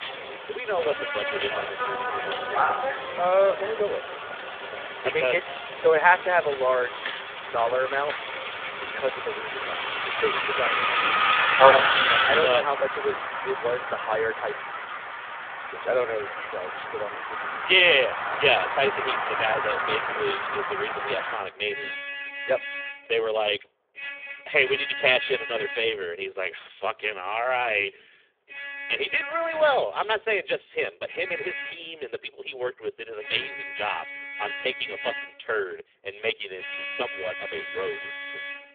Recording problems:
phone-call audio; poor line; nothing above 3.5 kHz
traffic noise; loud; throughout; 2 dB below the speech

